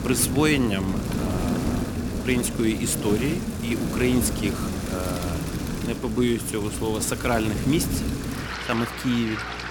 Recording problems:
rain or running water; loud; throughout; 3 dB below the speech
electrical hum; faint; throughout; 60 Hz, 20 dB below the speech

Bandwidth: 17.5 kHz